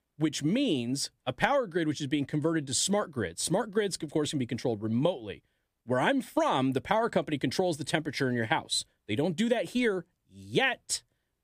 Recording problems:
none

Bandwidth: 15 kHz